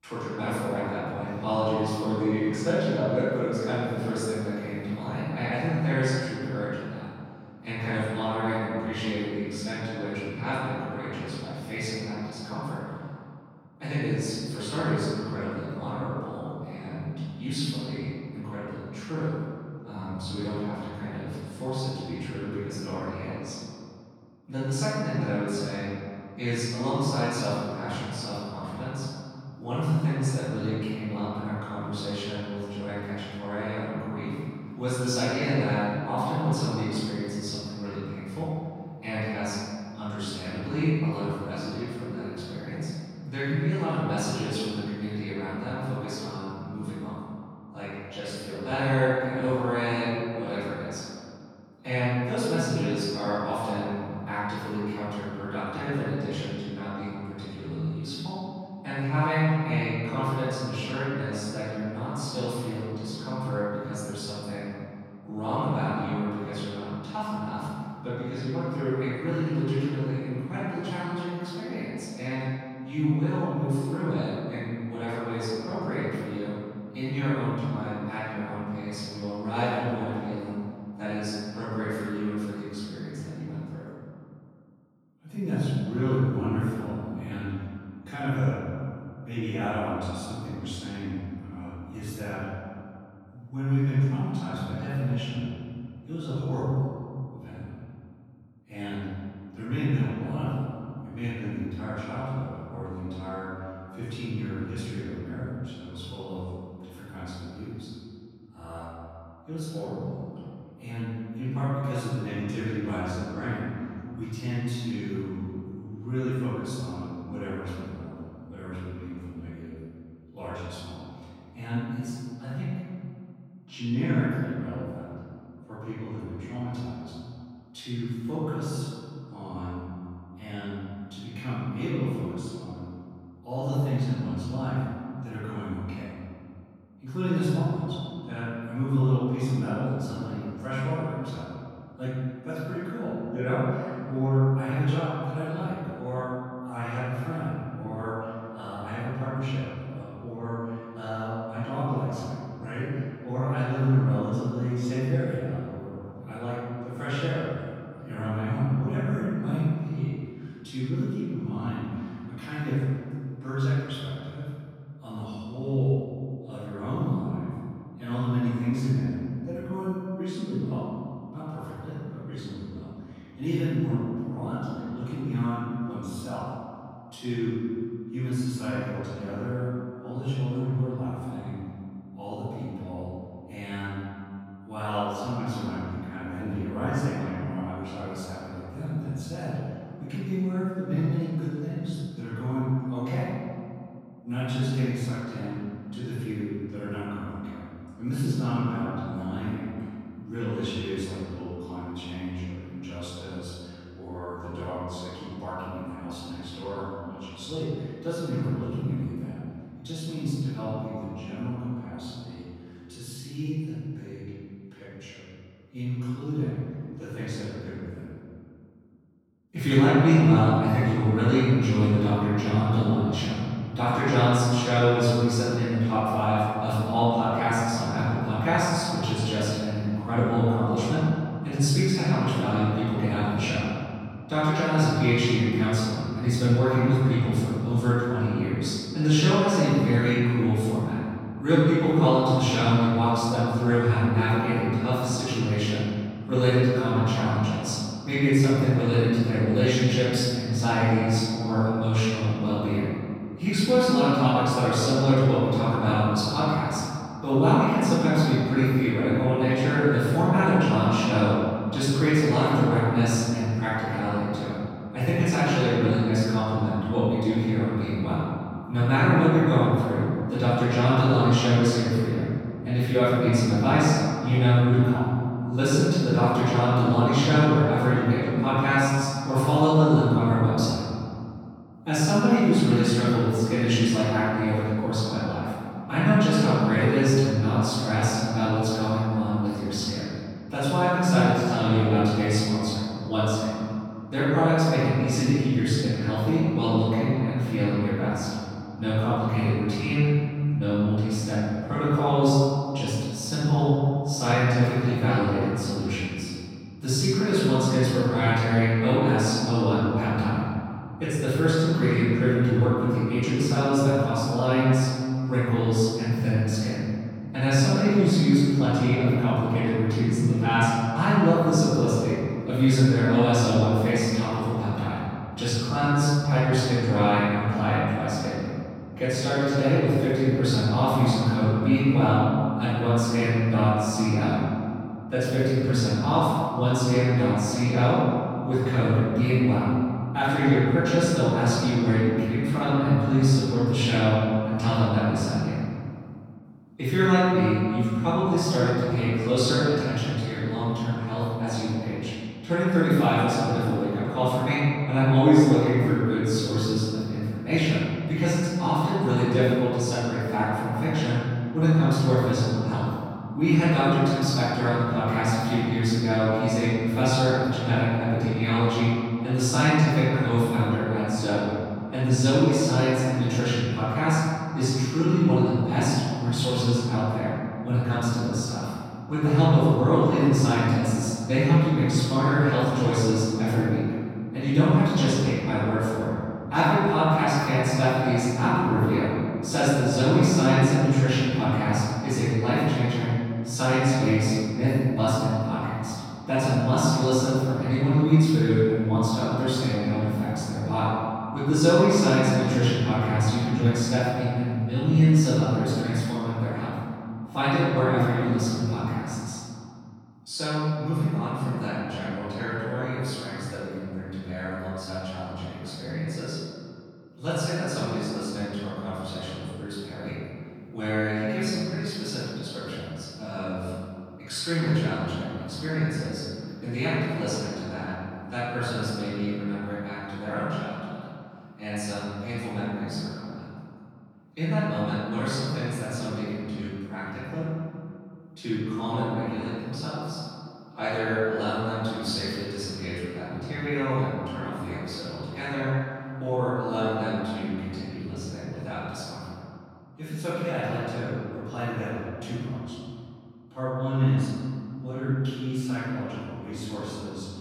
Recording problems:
room echo; strong; dies away in 2.3 s
off-mic speech; far

